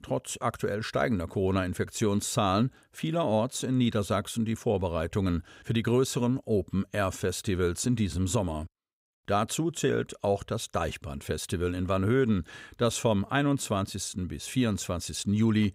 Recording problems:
none

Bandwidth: 15.5 kHz